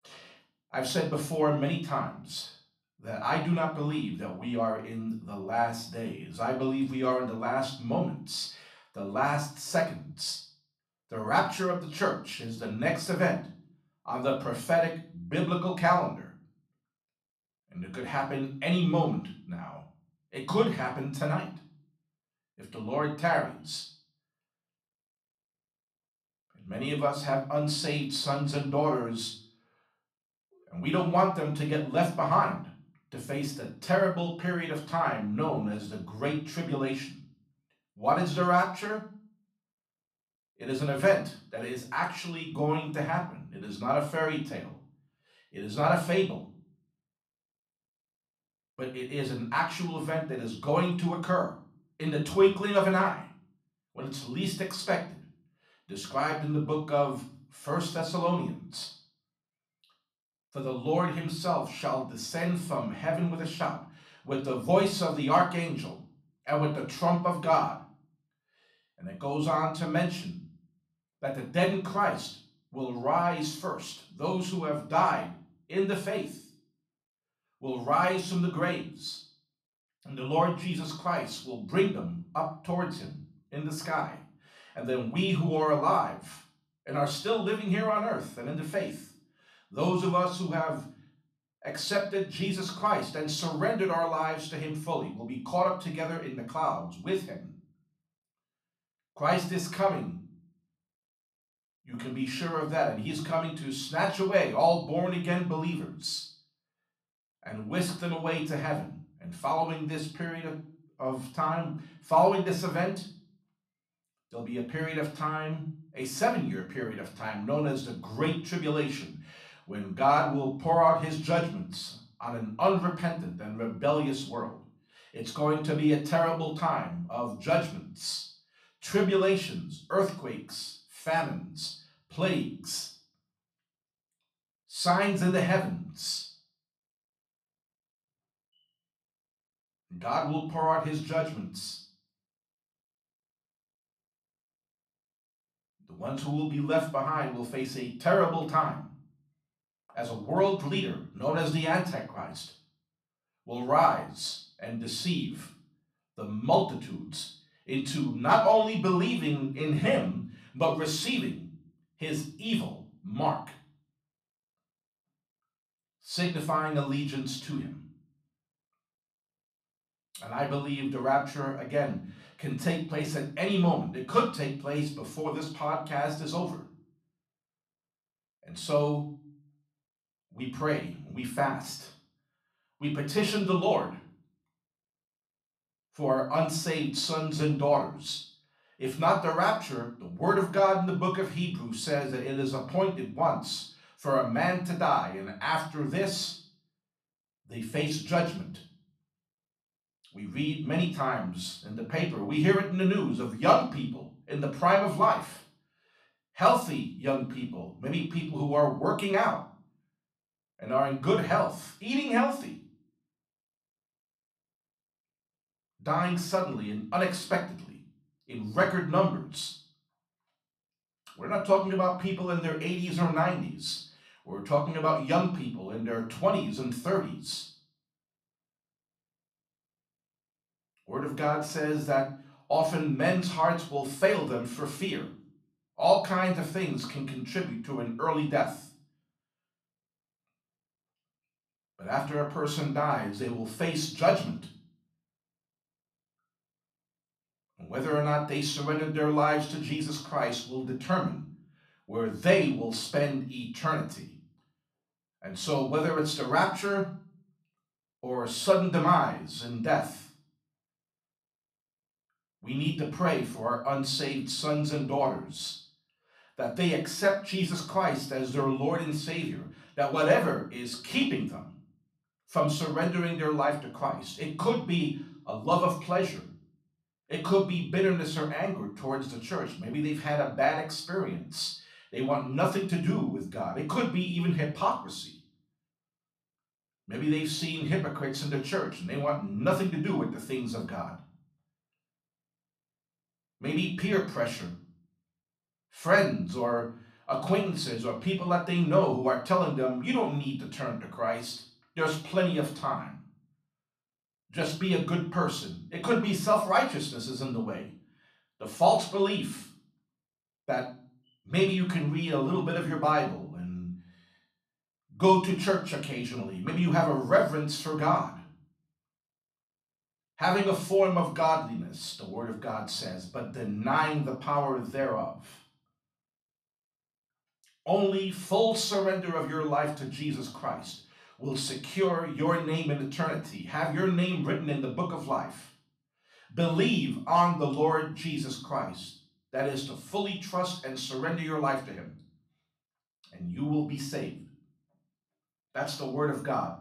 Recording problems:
off-mic speech; far
room echo; slight; dies away in 0.4 s

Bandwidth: 14 kHz